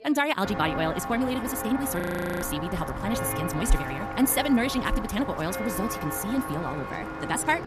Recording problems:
wrong speed, natural pitch; too fast; 1.7 times normal speed
voice in the background; faint; throughout; 25 dB below the speech
footsteps; noticeable; until 6 s; peak level with the speech
audio freezing; at 2 s

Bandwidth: 14 kHz